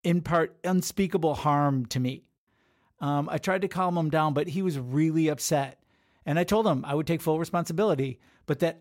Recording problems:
none

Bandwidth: 16 kHz